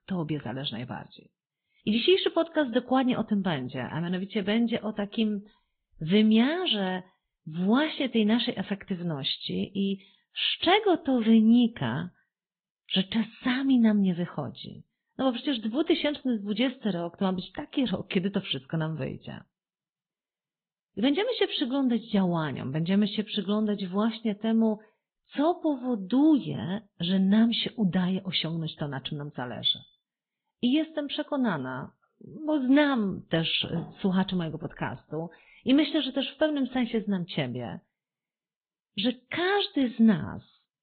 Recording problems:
high frequencies cut off; severe; nothing above 4 kHz
garbled, watery; slightly

